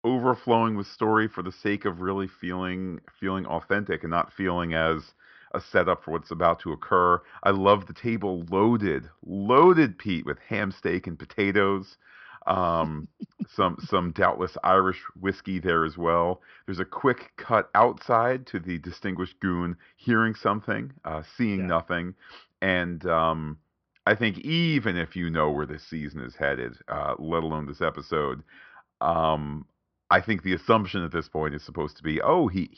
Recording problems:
high frequencies cut off; noticeable; nothing above 5.5 kHz

